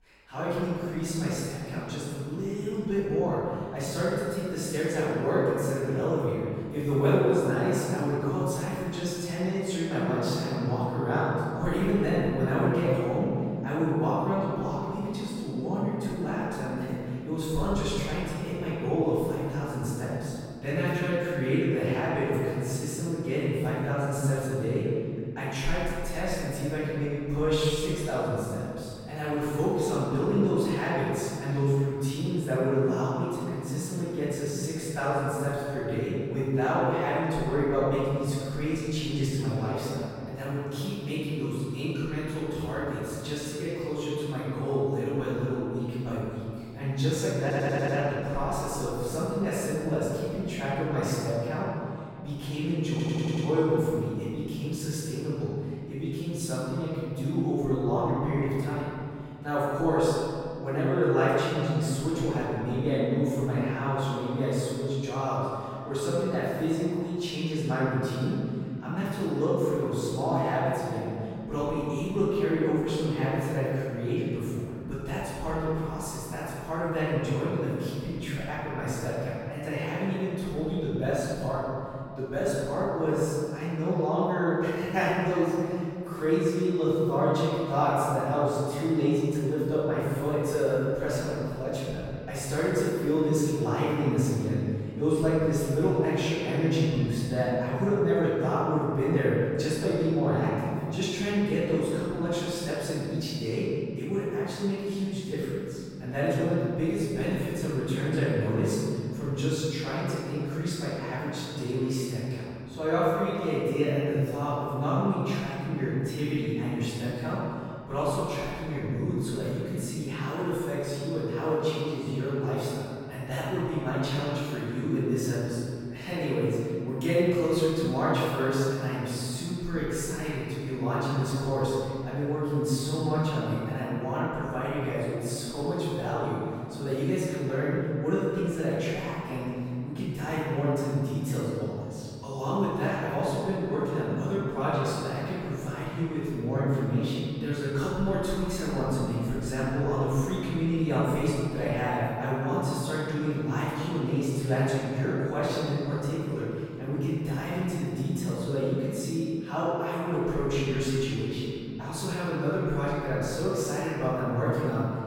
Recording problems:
room echo; strong; dies away in 2.4 s
off-mic speech; far
audio stuttering; at 47 s and at 53 s

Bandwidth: 16.5 kHz